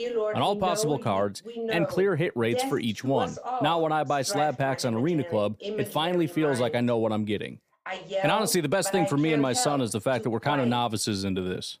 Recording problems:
voice in the background; loud; throughout; 7 dB below the speech

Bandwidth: 15 kHz